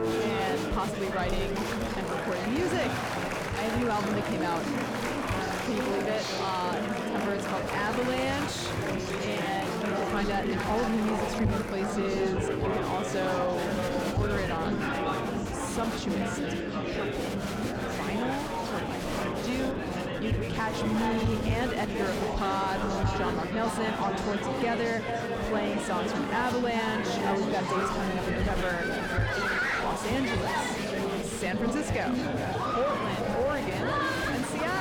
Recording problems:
echo of what is said; strong; from 10 s on; 420 ms later, 6 dB below the speech
distortion; slight; 10 dB below the speech
chatter from many people; very loud; throughout; 1 dB above the speech
wind noise on the microphone; occasional gusts; 20 dB below the speech
abrupt cut into speech; at the end

